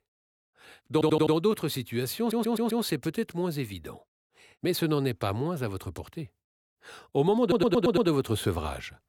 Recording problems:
audio stuttering; at 1 s, at 2 s and at 7.5 s

